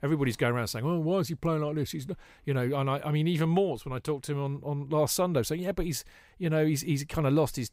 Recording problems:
none

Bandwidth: 15.5 kHz